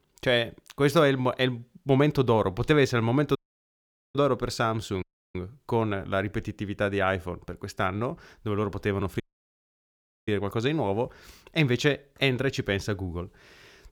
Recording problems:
audio cutting out; at 3.5 s for 1 s, at 5 s and at 9 s for 1 s

